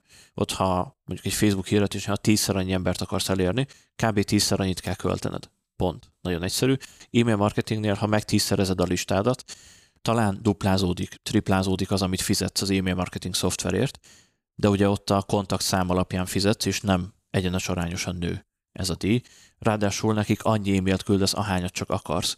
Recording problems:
none

